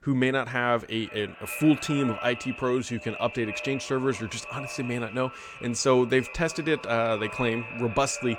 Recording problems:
echo of what is said; strong; throughout; 380 ms later, 10 dB below the speech

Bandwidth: 17.5 kHz